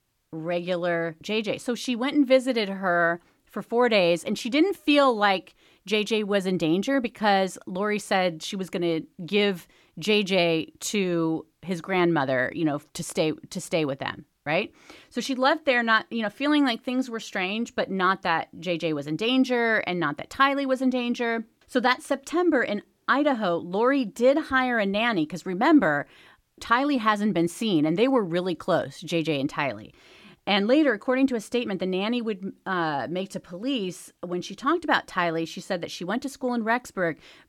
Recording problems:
none

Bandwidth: 17.5 kHz